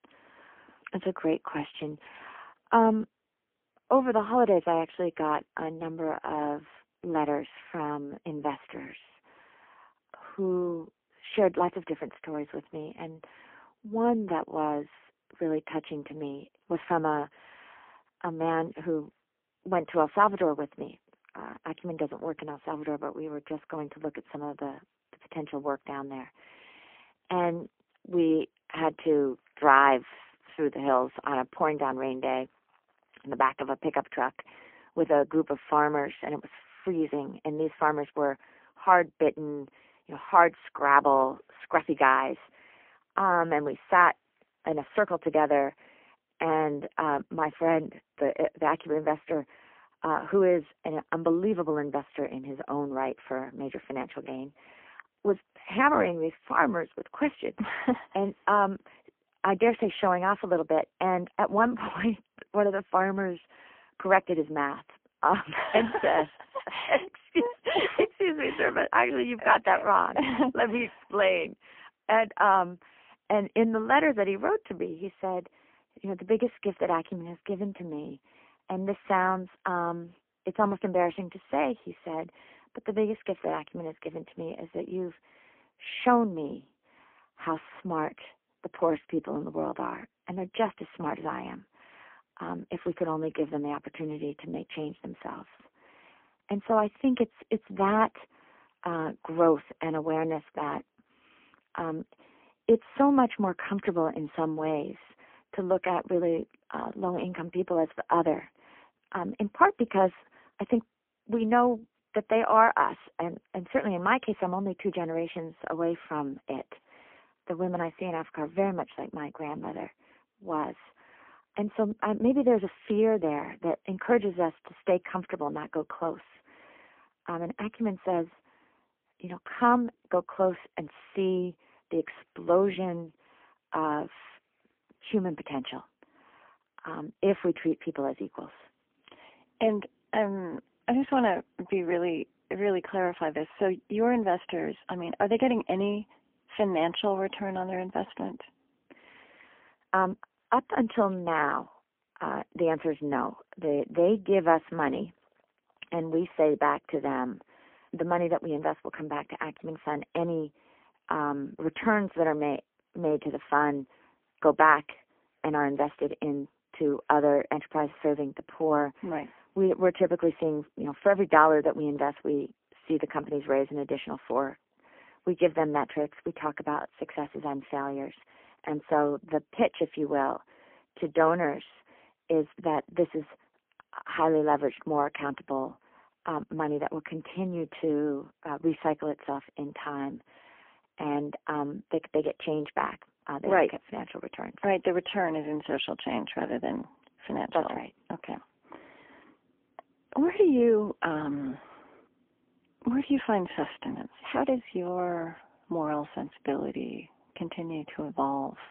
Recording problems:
phone-call audio; poor line; nothing above 3.5 kHz

